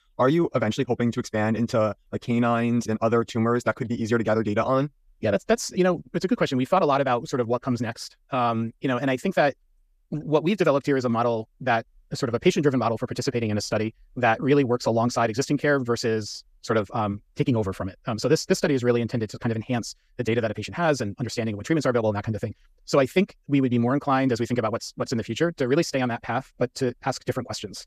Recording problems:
wrong speed, natural pitch; too fast; 1.6 times normal speed

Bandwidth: 14.5 kHz